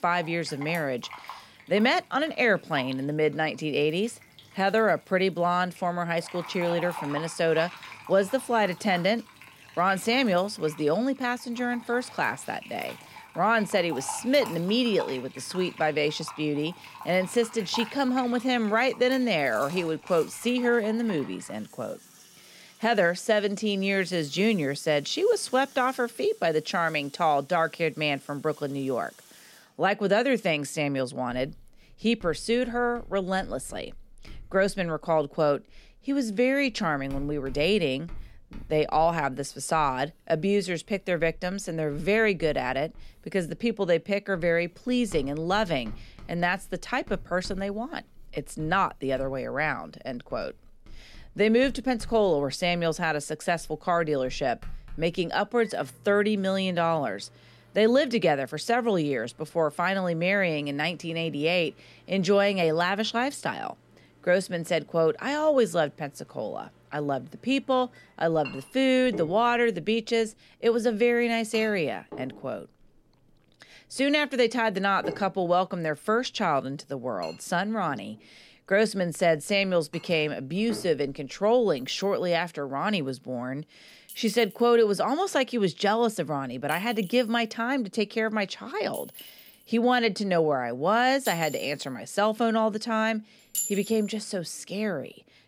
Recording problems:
household noises; noticeable; throughout; 20 dB below the speech

